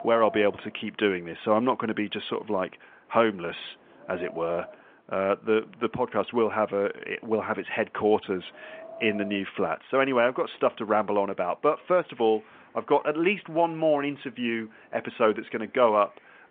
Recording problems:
phone-call audio
wind in the background; noticeable; throughout; 20 dB below the speech

